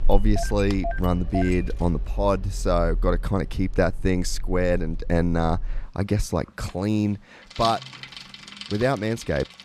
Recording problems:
traffic noise; loud; throughout; 8 dB below the speech

